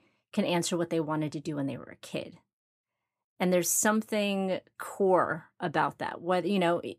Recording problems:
none

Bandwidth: 15 kHz